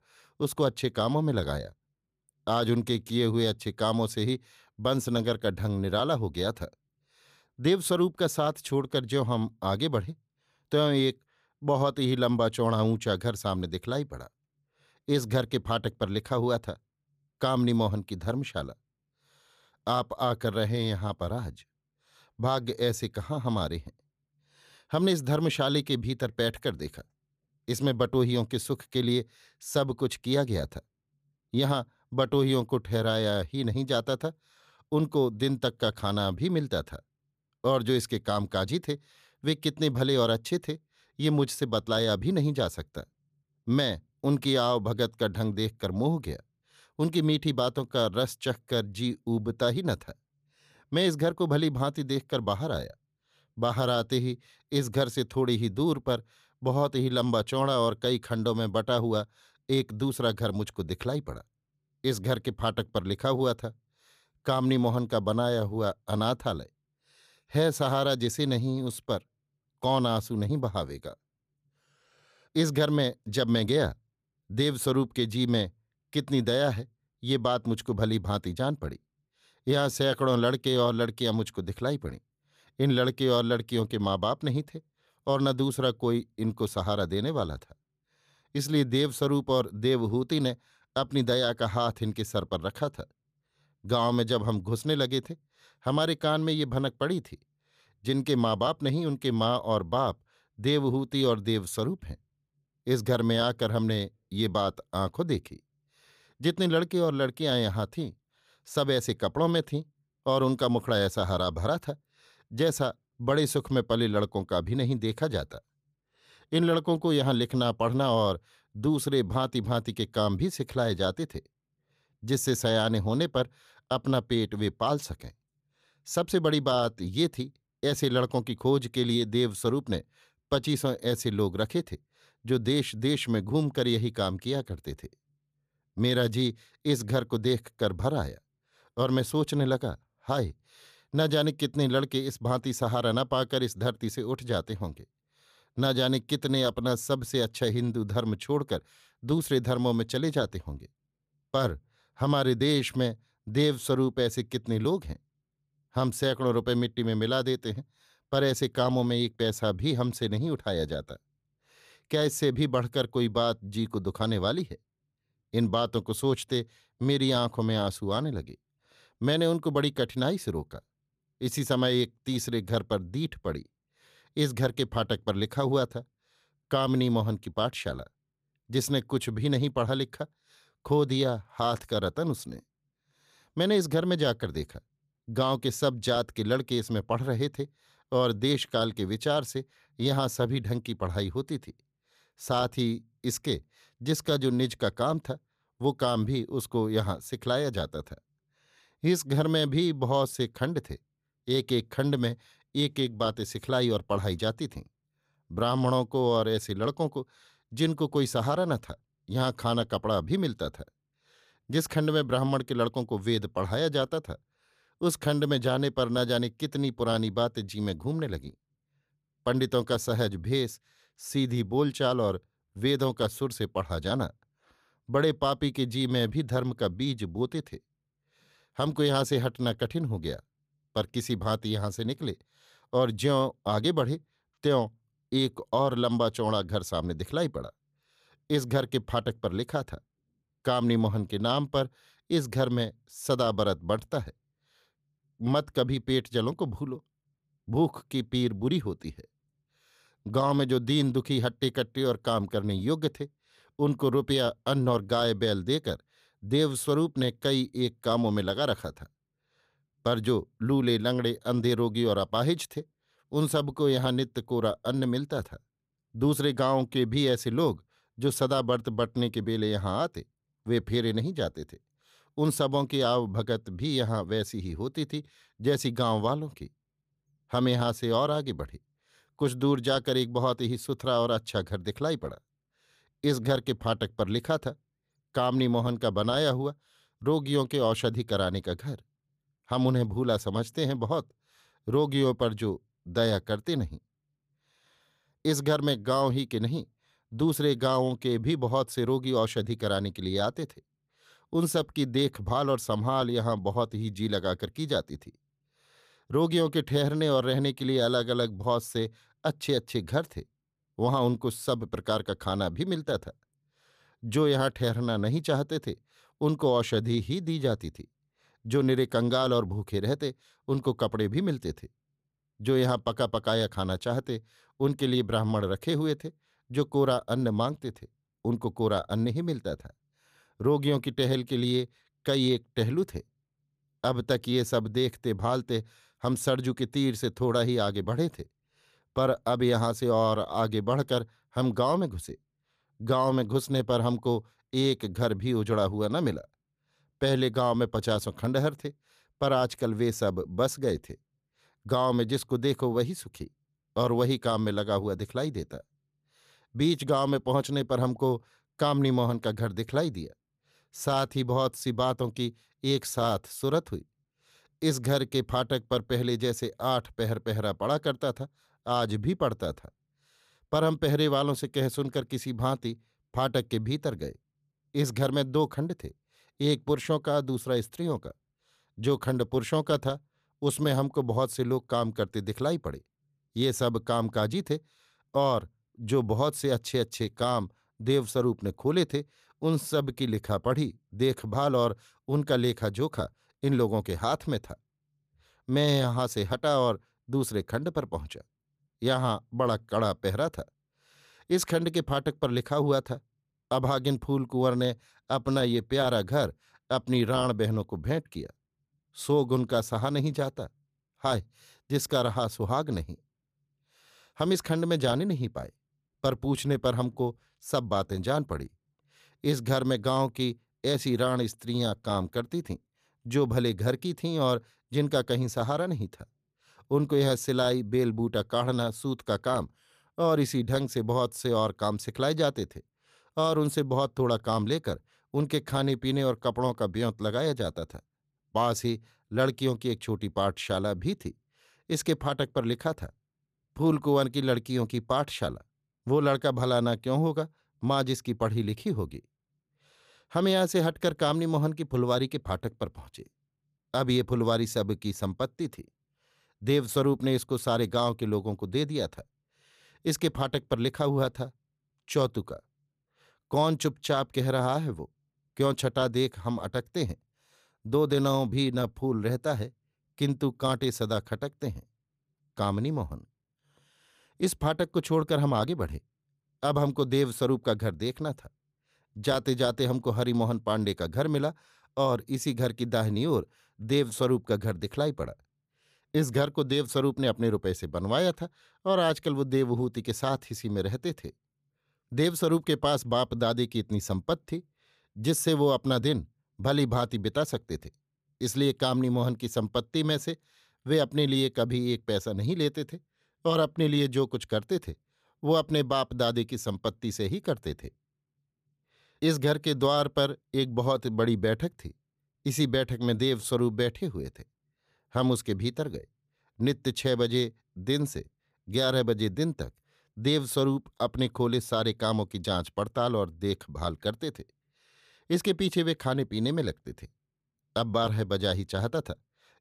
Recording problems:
none

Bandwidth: 14.5 kHz